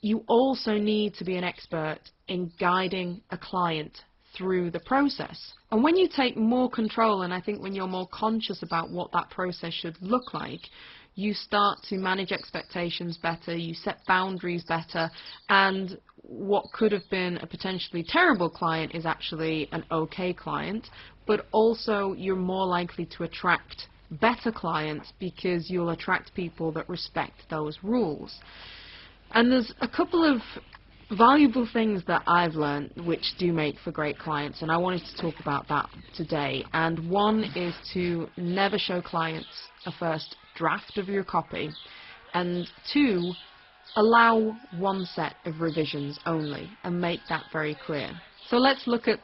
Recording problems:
garbled, watery; badly; nothing above 5.5 kHz
animal sounds; faint; throughout; 20 dB below the speech

